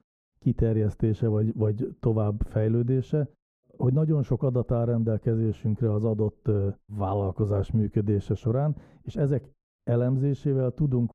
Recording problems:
muffled; very; fading above 1.5 kHz

